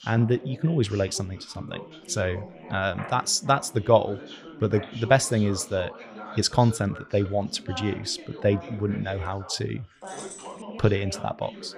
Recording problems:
background chatter; noticeable; throughout; 3 voices, 15 dB below the speech
jangling keys; faint; at 10 s; peak 15 dB below the speech

